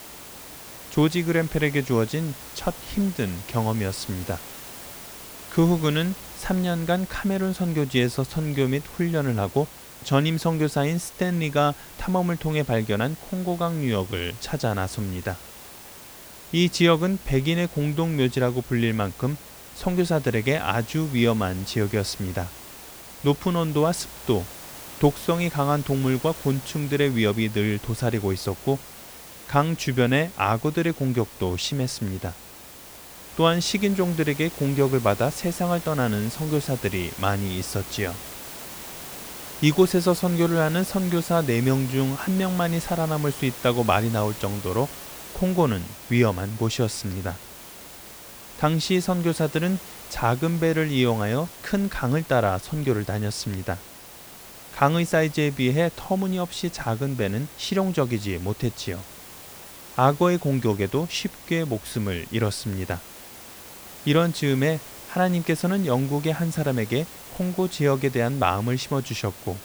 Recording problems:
hiss; noticeable; throughout; 15 dB below the speech

